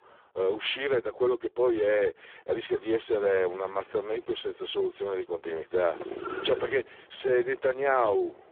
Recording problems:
phone-call audio; poor line; nothing above 3.5 kHz
traffic noise; noticeable; throughout; 15 dB below the speech

